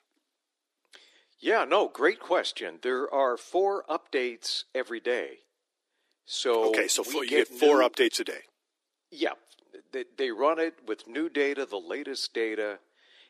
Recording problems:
thin; somewhat; fading below 300 Hz

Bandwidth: 14.5 kHz